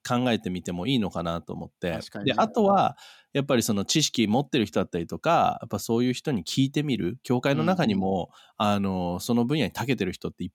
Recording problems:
none

